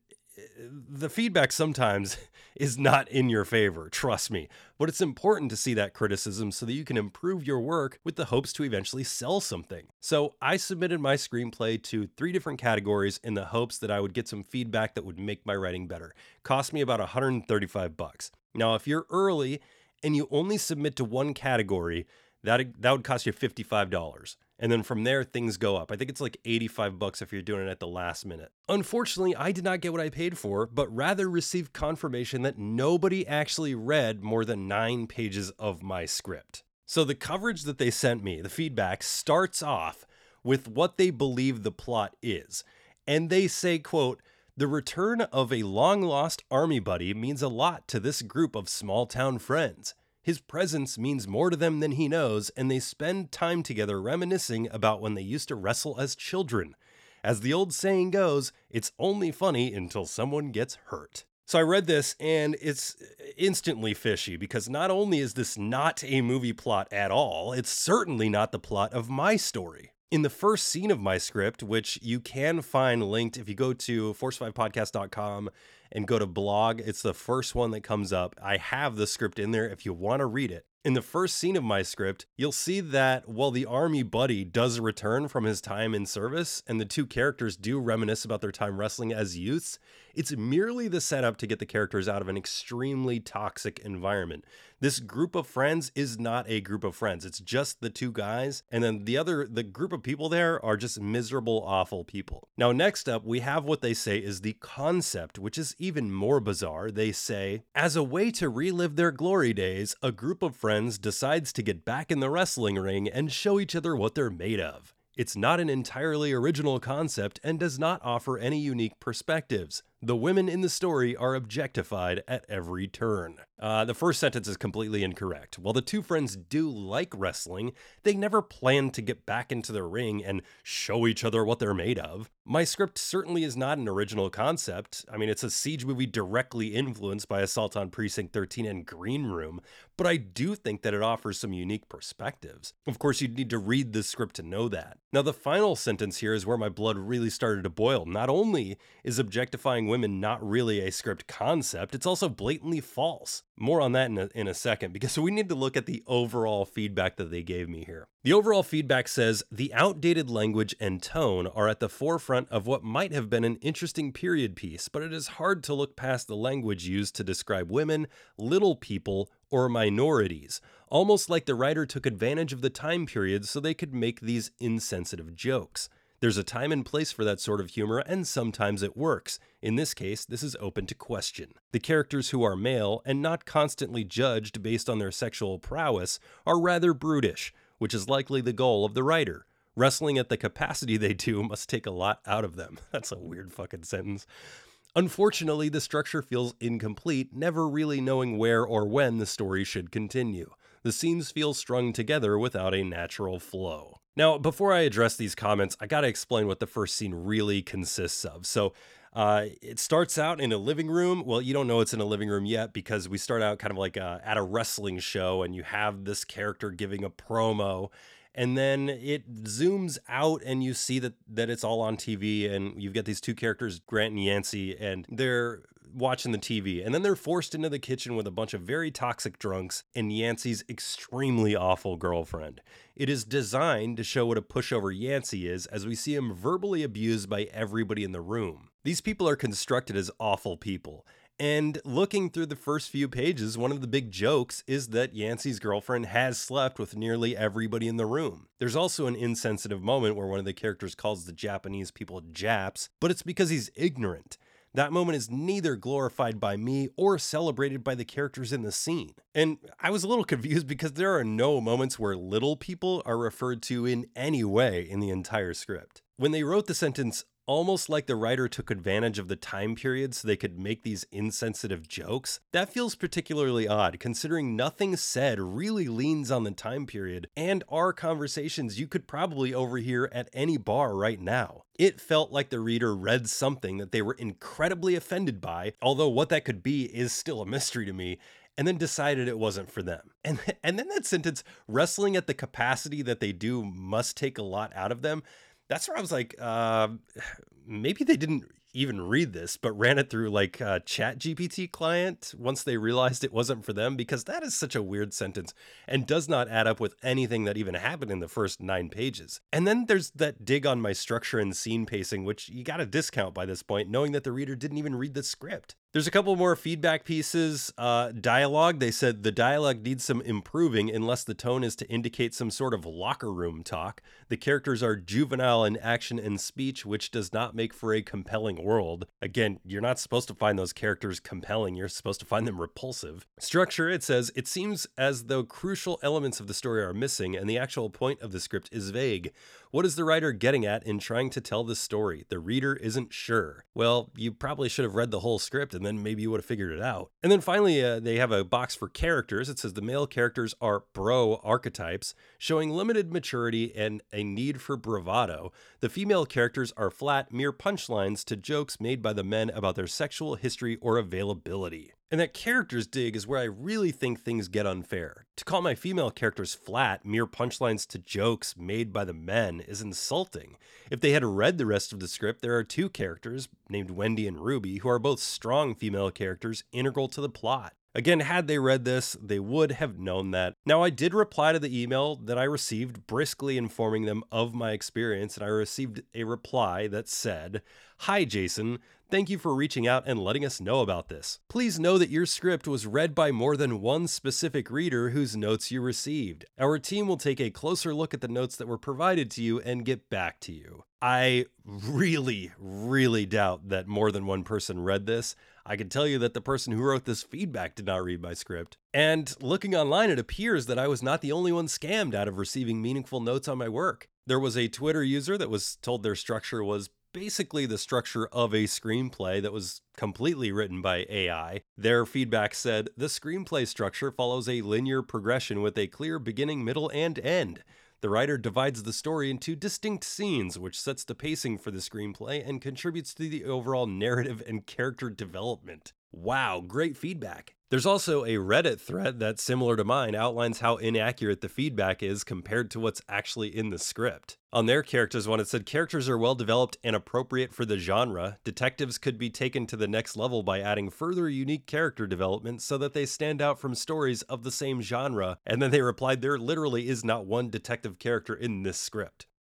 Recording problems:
none

